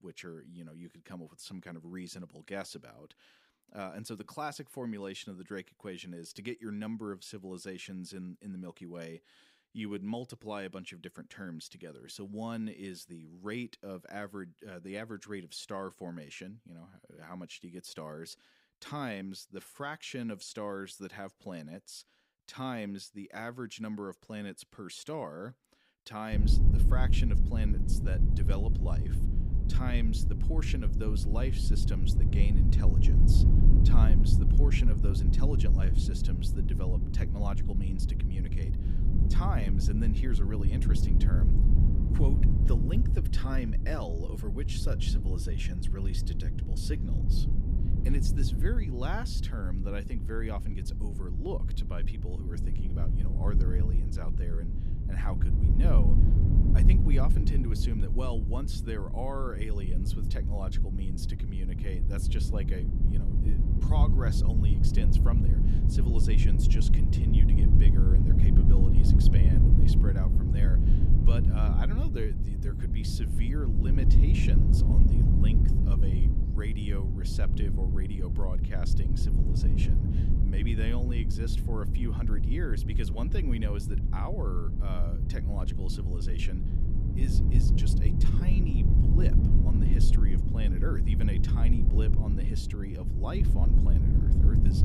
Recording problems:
low rumble; loud; from 26 s on; as loud as the speech

